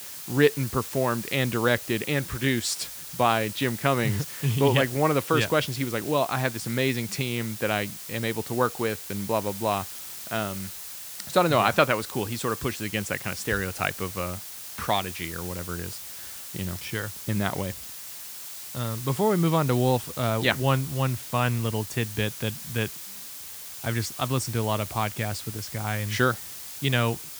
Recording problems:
hiss; loud; throughout; 9 dB below the speech

